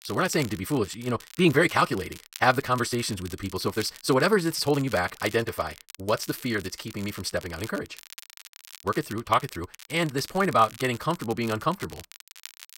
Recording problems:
wrong speed, natural pitch; too fast; 1.5 times normal speed
crackle, like an old record; noticeable; 20 dB below the speech

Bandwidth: 16 kHz